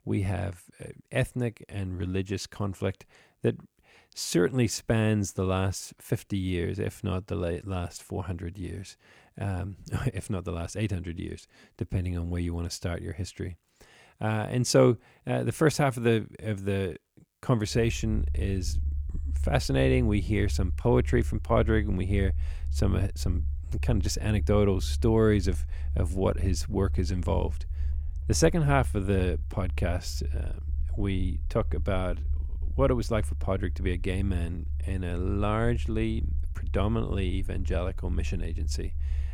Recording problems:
low rumble; faint; from 18 s on; 20 dB below the speech

